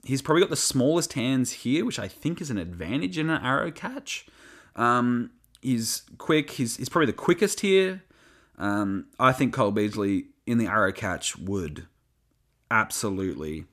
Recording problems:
none

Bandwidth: 14.5 kHz